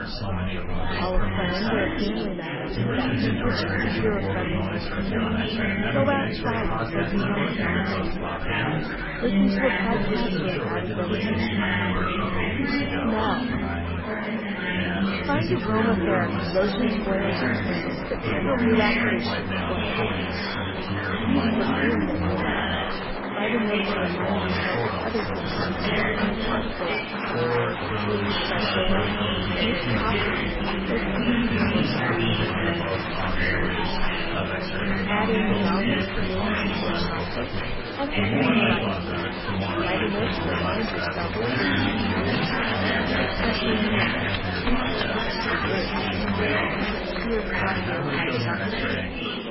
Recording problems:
garbled, watery; badly; nothing above 5.5 kHz
chatter from many people; very loud; throughout; 6 dB above the speech

